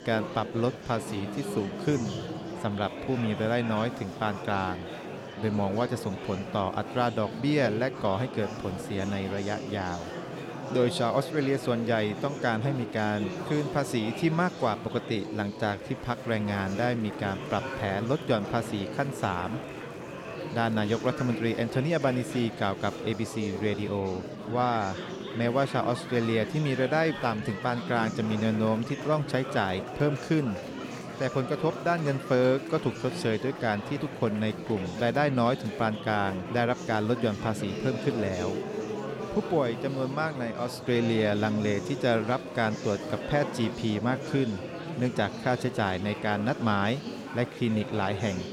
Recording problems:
murmuring crowd; loud; throughout; 8 dB below the speech

